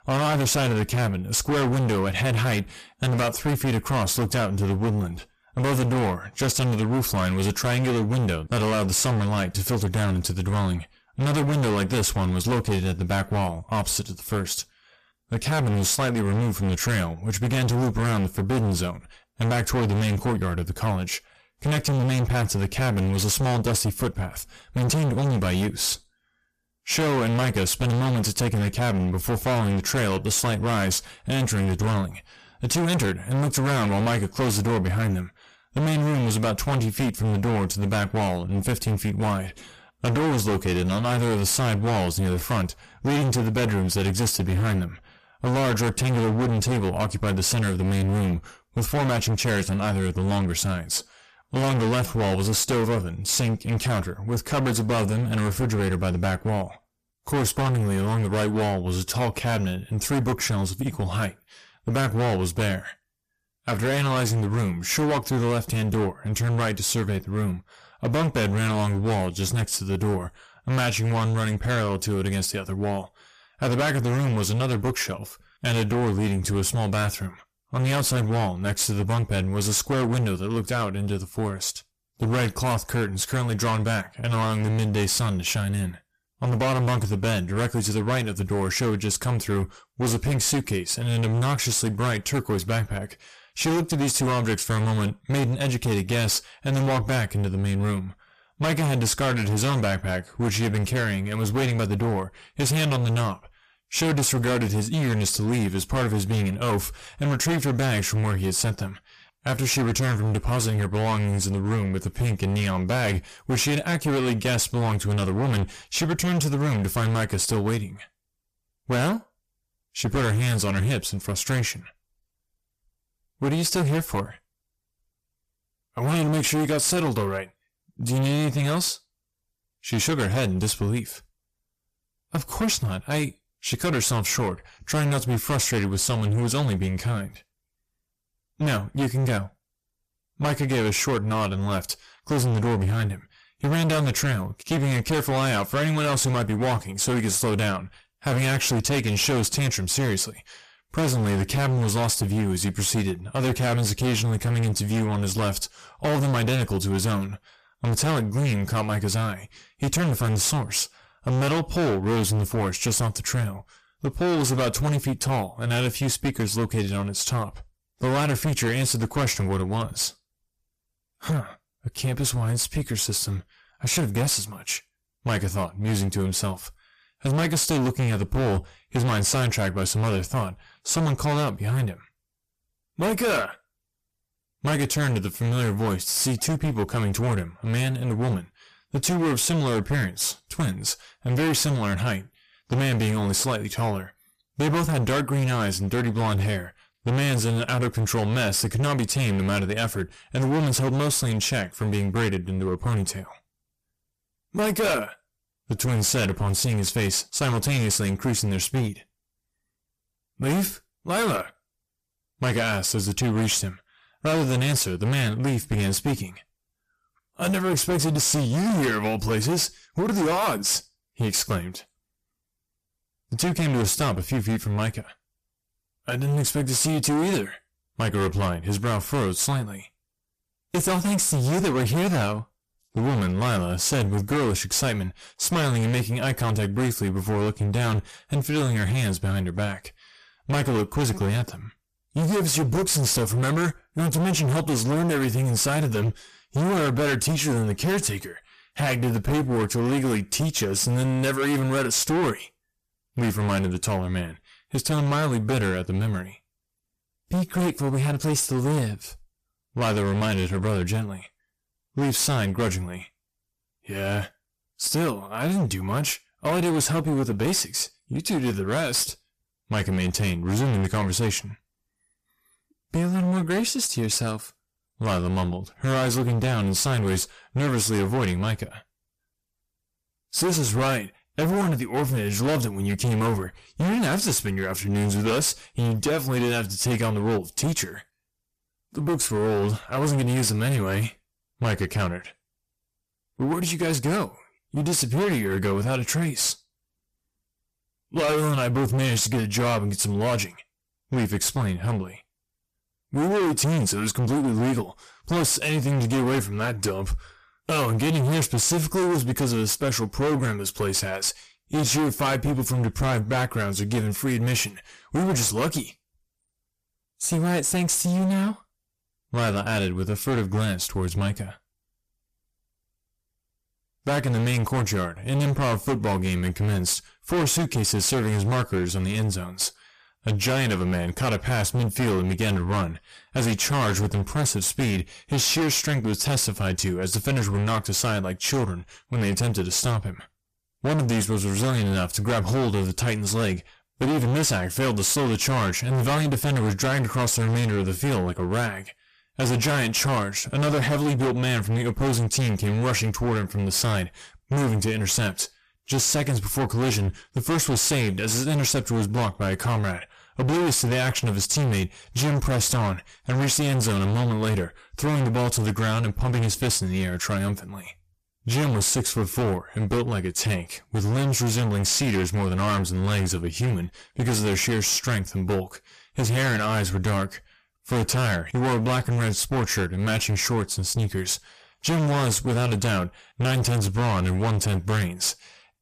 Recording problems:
distortion; heavy; 26% of the sound clipped

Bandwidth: 14.5 kHz